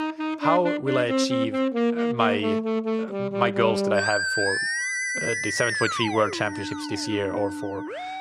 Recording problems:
background music; very loud; throughout; as loud as the speech

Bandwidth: 13.5 kHz